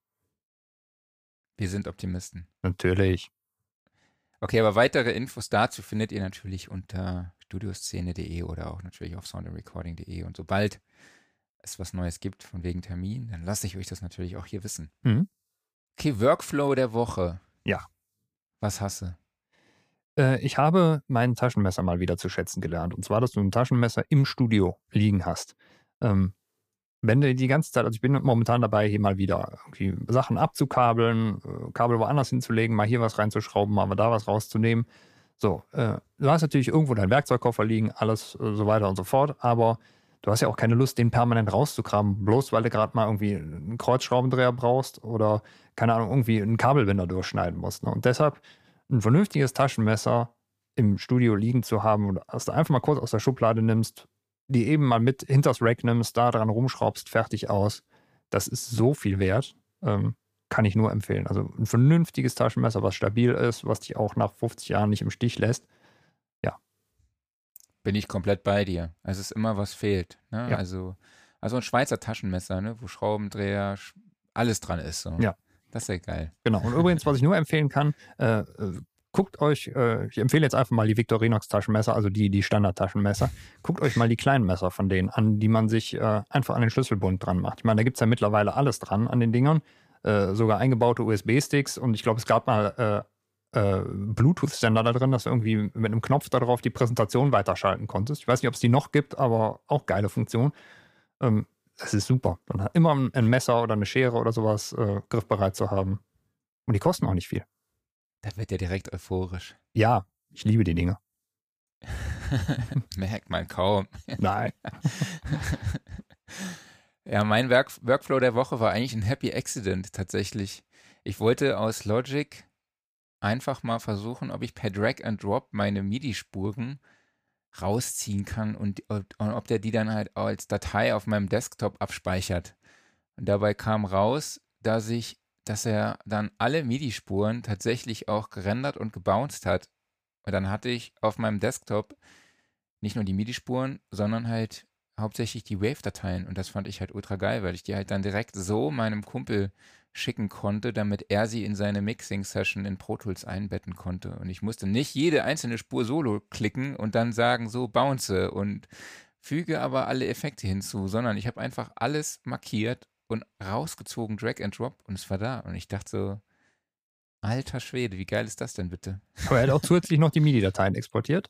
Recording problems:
none

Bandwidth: 15 kHz